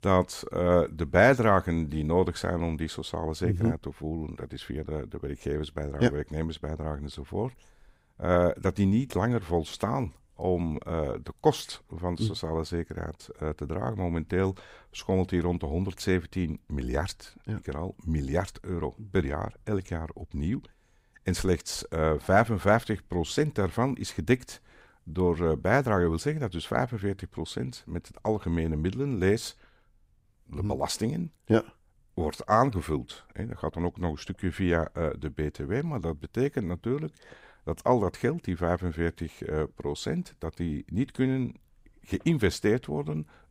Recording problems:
none

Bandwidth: 15.5 kHz